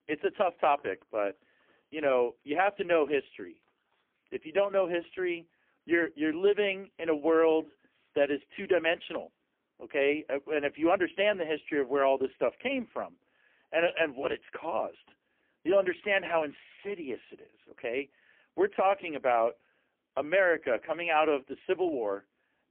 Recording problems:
phone-call audio; poor line; nothing above 3 kHz

